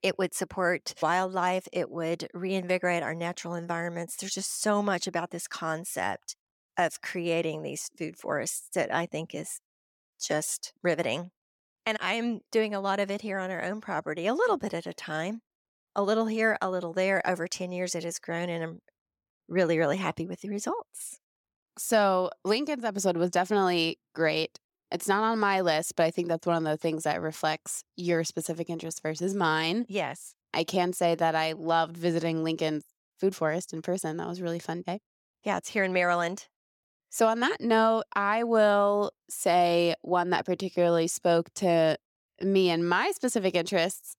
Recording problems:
none

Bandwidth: 17.5 kHz